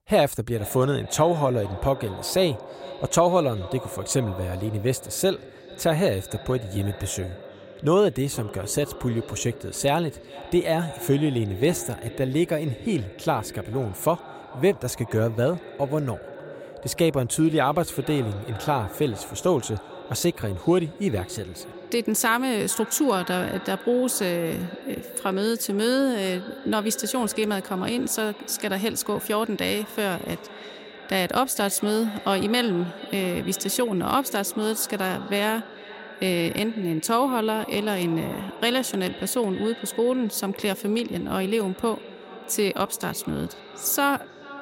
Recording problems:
echo of what is said; noticeable; throughout; 440 ms later, 15 dB below the speech

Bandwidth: 16 kHz